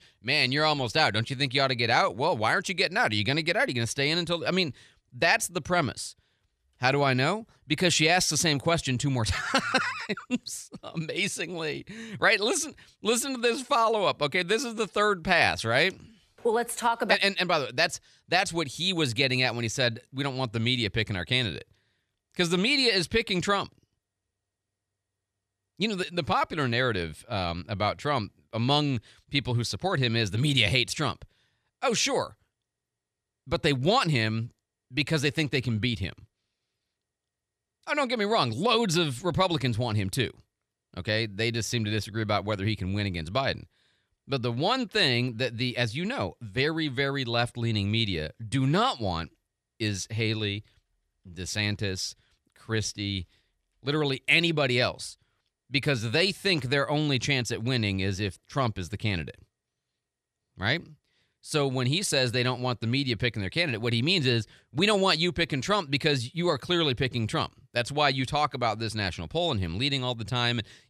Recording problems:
none

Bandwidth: 13.5 kHz